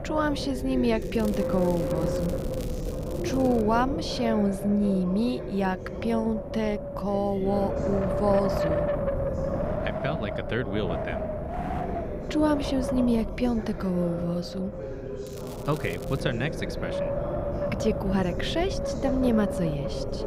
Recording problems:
wind noise on the microphone; heavy; 3 dB below the speech
voice in the background; loud; throughout; 9 dB below the speech
crackling; noticeable; from 1 to 3.5 s and at 15 s; 20 dB below the speech

